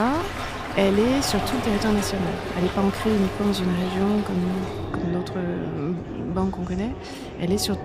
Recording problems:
echo of what is said; strong; throughout; 540 ms later, 10 dB below the speech
rain or running water; loud; throughout; 8 dB below the speech
murmuring crowd; noticeable; throughout; 15 dB below the speech
abrupt cut into speech; at the start

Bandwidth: 15 kHz